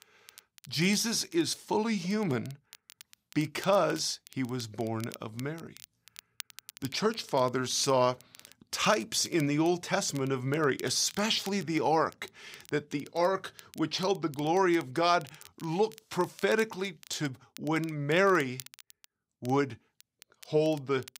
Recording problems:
crackle, like an old record; faint; 20 dB below the speech

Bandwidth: 15.5 kHz